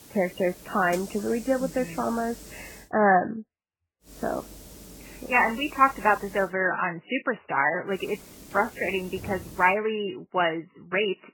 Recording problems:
garbled, watery; badly; nothing above 3 kHz
hiss; noticeable; until 3 s, from 4 to 6.5 s and from 8 to 9.5 s; 20 dB below the speech

